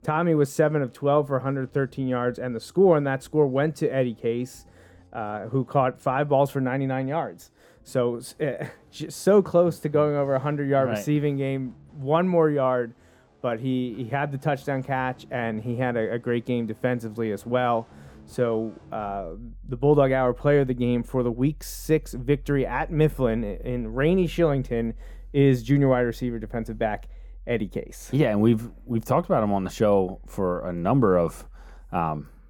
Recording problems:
muffled; slightly; fading above 1 kHz
background music; faint; throughout; 25 dB below the speech

